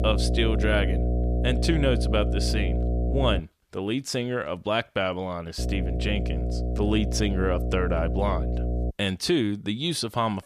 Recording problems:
electrical hum; loud; until 3.5 s and from 5.5 to 9 s; 60 Hz, 8 dB below the speech

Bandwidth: 14.5 kHz